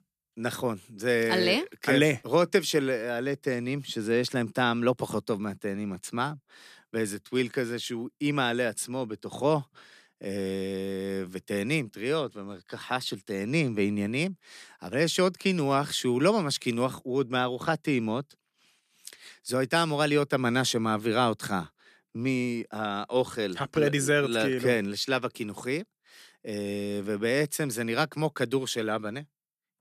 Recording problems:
none

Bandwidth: 14.5 kHz